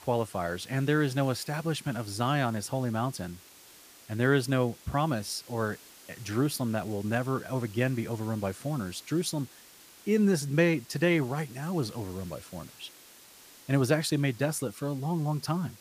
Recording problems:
hiss; faint; throughout; 20 dB below the speech

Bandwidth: 15 kHz